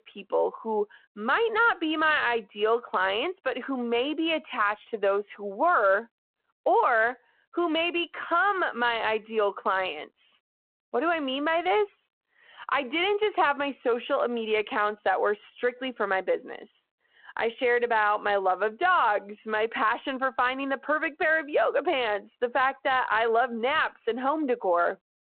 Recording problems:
phone-call audio

